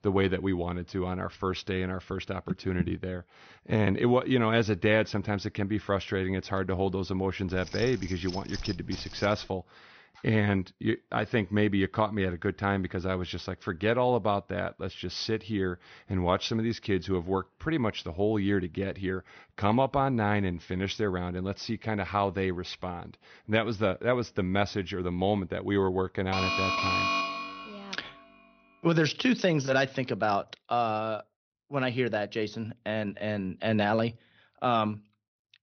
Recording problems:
high frequencies cut off; noticeable; nothing above 6 kHz
jangling keys; faint; from 7.5 to 9.5 s; peak 10 dB below the speech
alarm; loud; from 26 to 28 s; peak 3 dB above the speech

